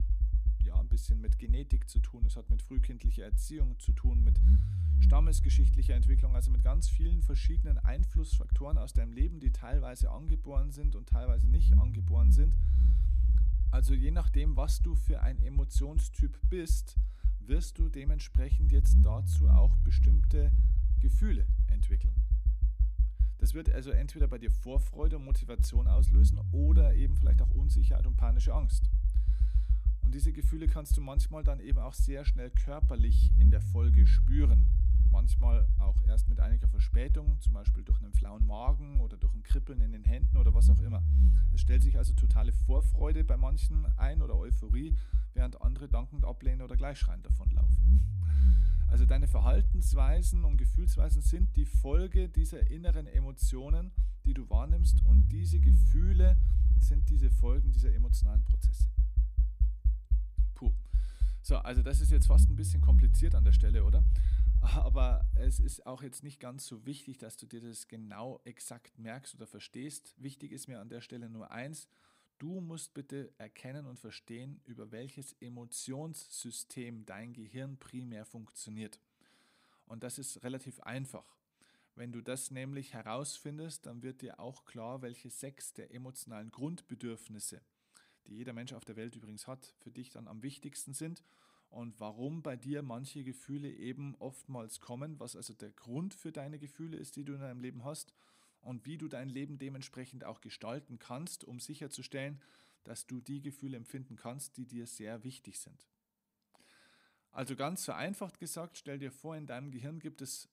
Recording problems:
low rumble; loud; until 1:06; 3 dB below the speech

